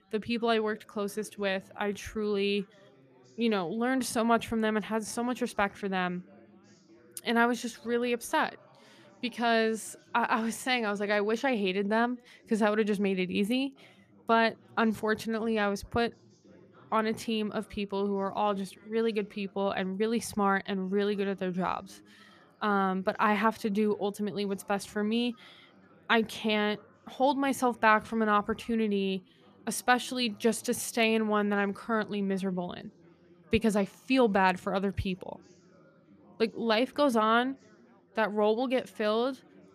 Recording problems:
background chatter; faint; throughout; 4 voices, 30 dB below the speech

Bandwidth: 14.5 kHz